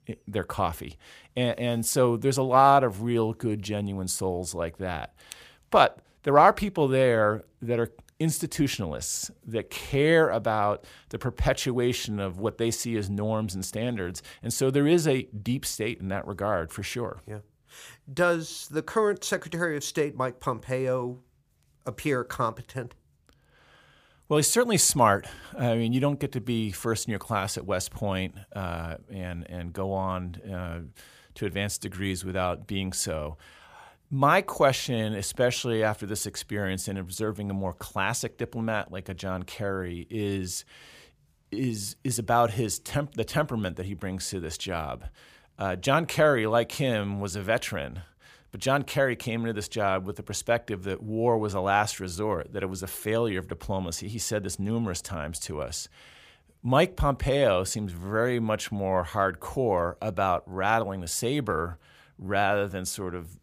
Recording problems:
none

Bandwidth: 15 kHz